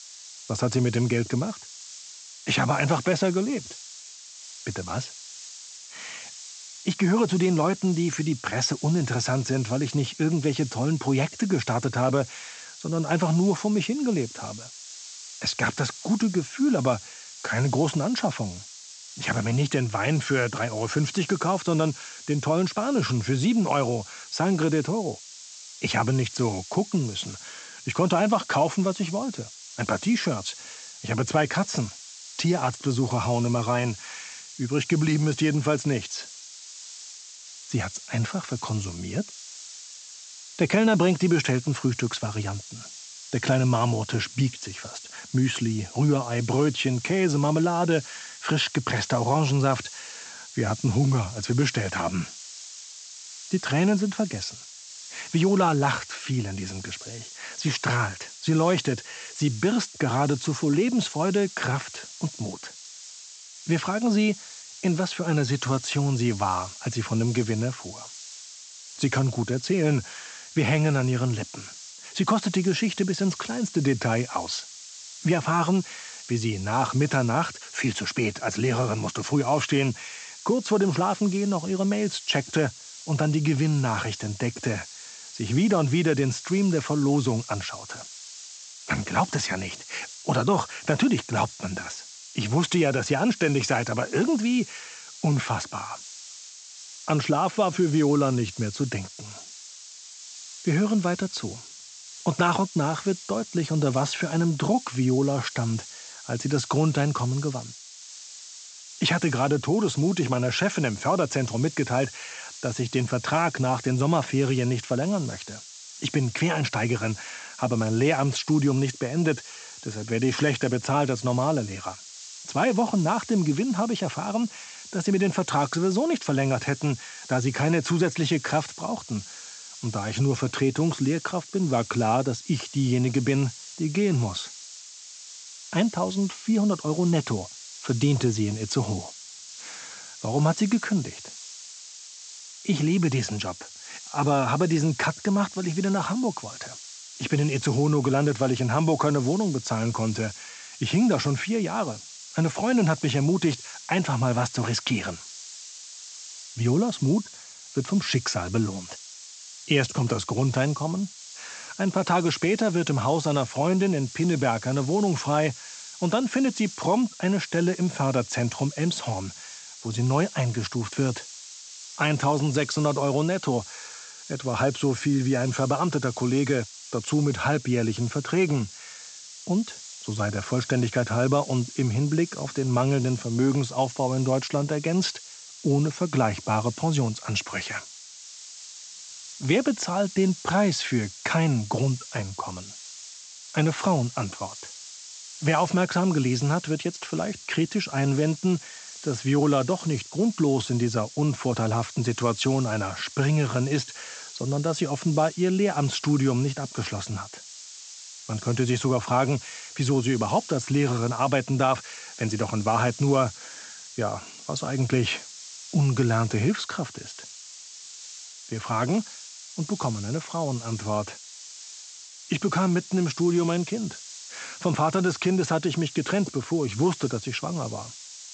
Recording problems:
high frequencies cut off; noticeable; nothing above 8 kHz
hiss; noticeable; throughout; 15 dB below the speech

